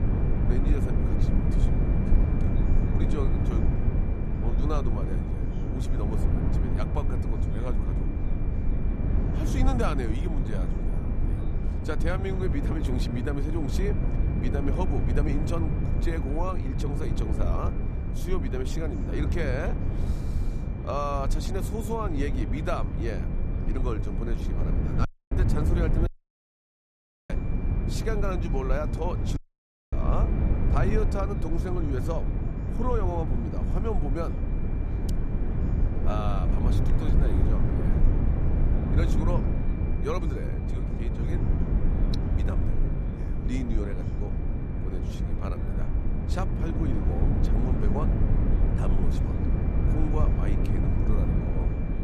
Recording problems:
low rumble; loud; throughout; 3 dB below the speech
high-pitched whine; faint; throughout; 2.5 kHz, 20 dB below the speech
background chatter; faint; throughout; 3 voices, 20 dB below the speech
audio cutting out; at 25 s, at 26 s for 1 s and at 29 s for 0.5 s

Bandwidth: 15 kHz